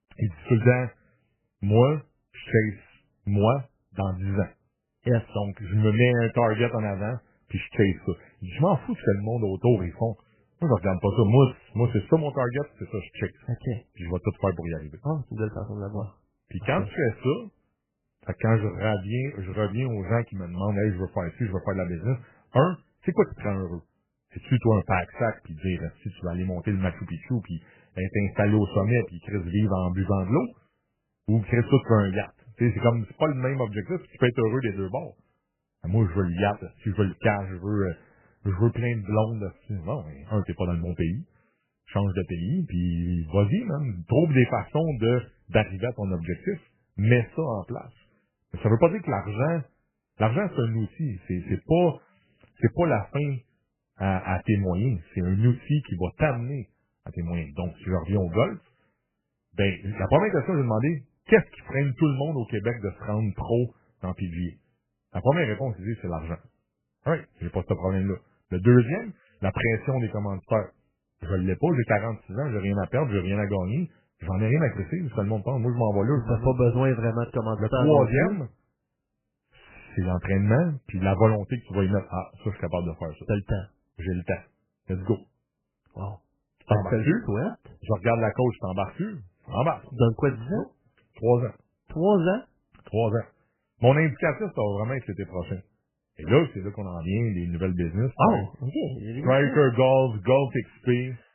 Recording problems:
garbled, watery; badly; nothing above 3 kHz

